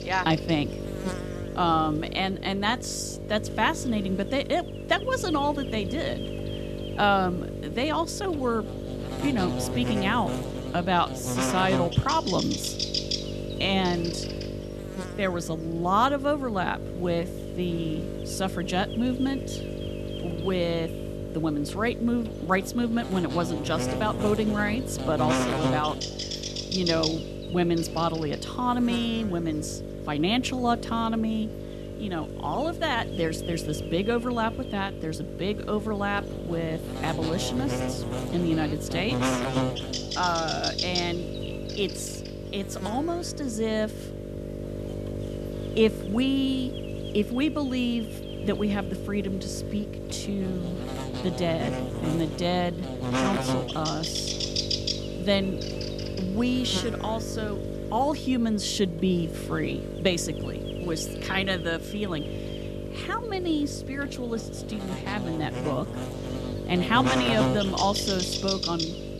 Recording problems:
electrical hum; loud; throughout; 50 Hz, 6 dB below the speech

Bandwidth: 13.5 kHz